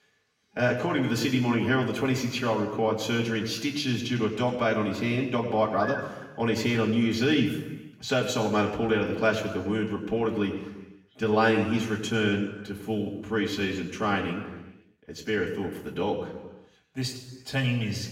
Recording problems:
off-mic speech; far
room echo; noticeable; dies away in 1.1 s

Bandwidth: 16 kHz